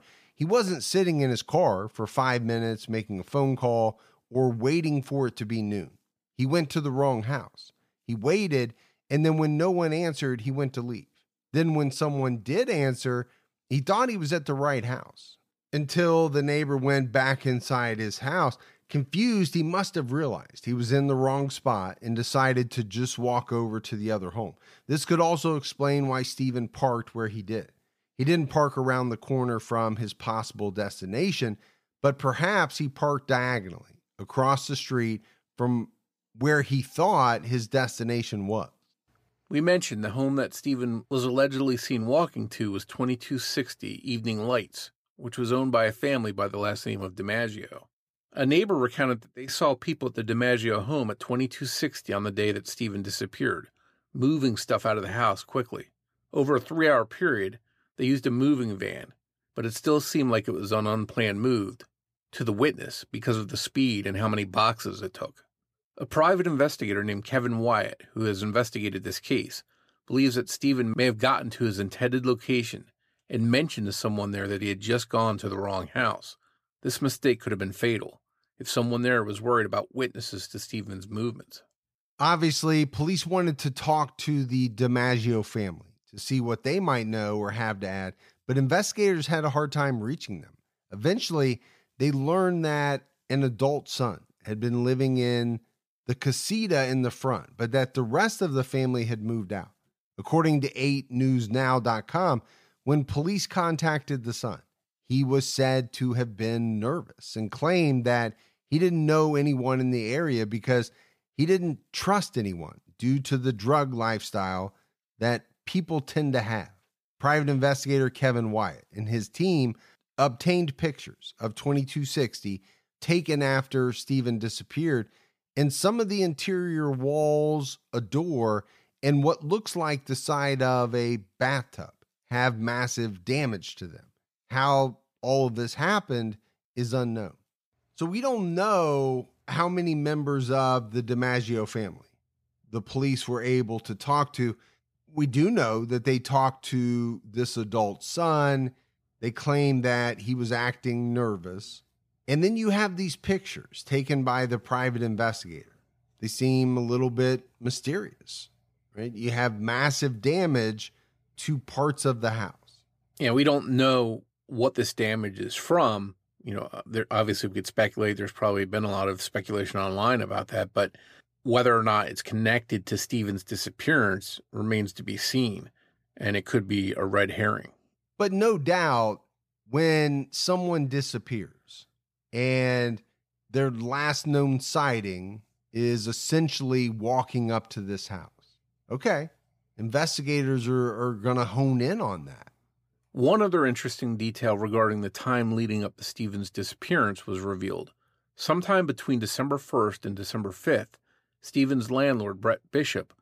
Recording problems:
none

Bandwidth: 15 kHz